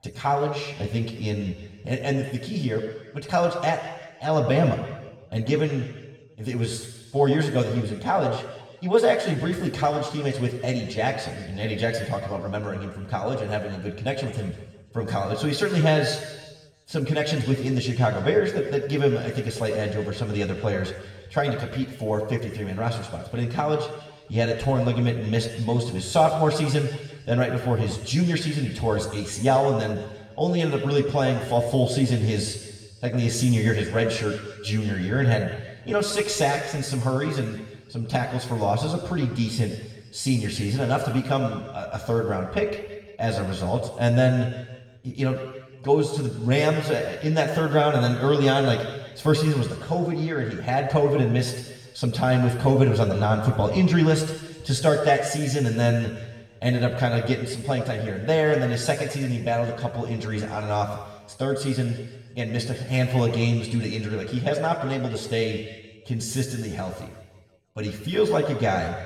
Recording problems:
off-mic speech; far
room echo; noticeable; dies away in 1.3 s

